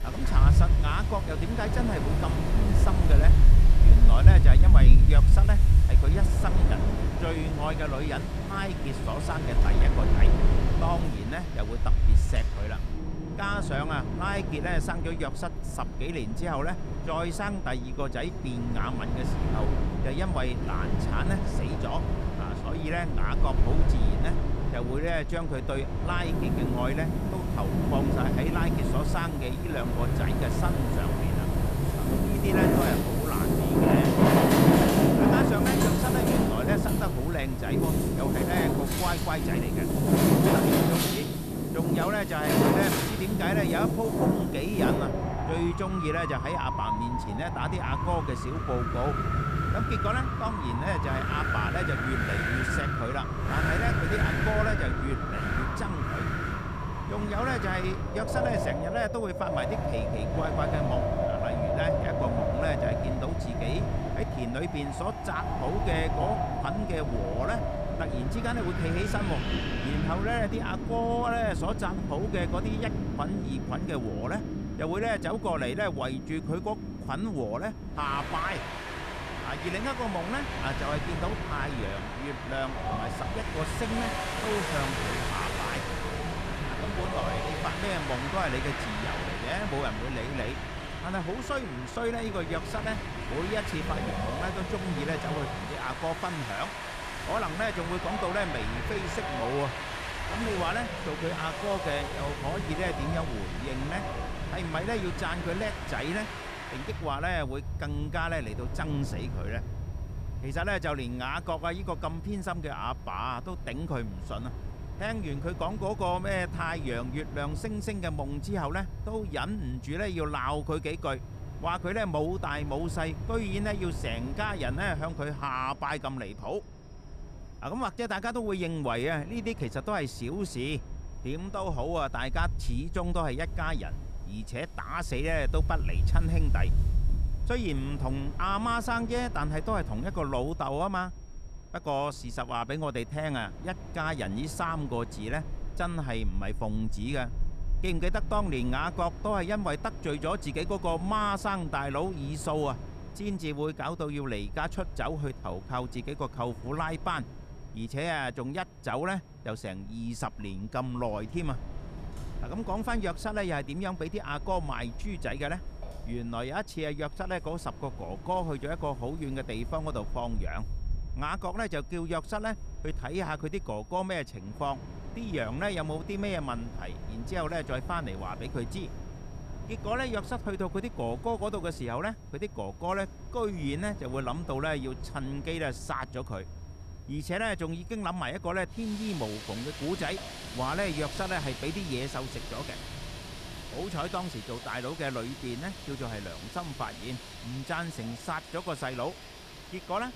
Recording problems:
wind in the background; very loud; throughout; 4 dB above the speech
high-pitched whine; faint; throughout; 5.5 kHz, 30 dB below the speech

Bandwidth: 14.5 kHz